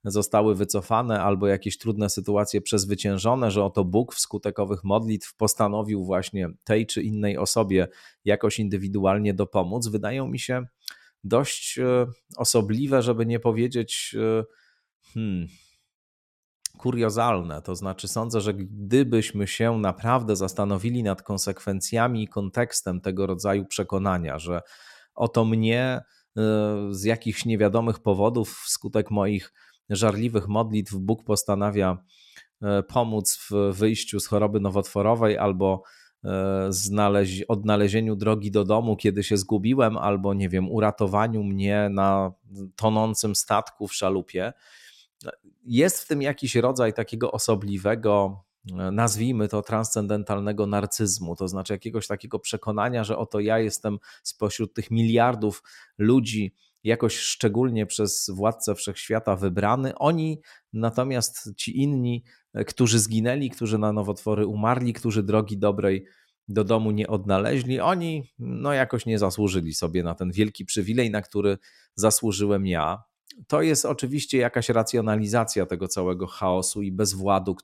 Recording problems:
none

